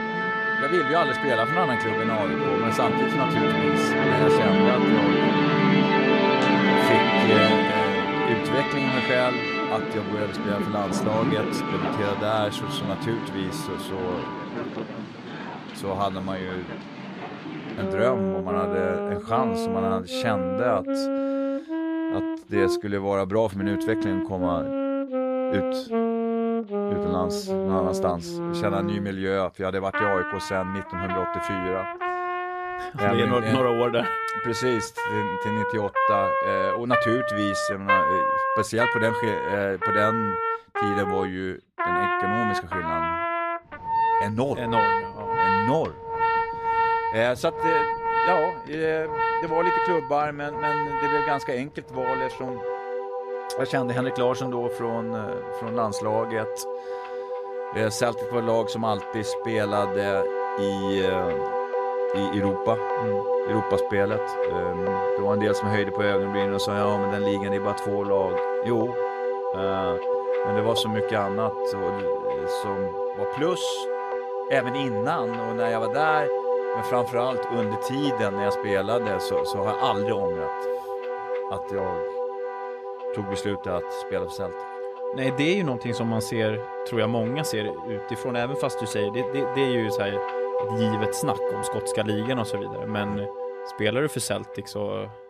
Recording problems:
background music; very loud; throughout; 2 dB above the speech

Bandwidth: 14 kHz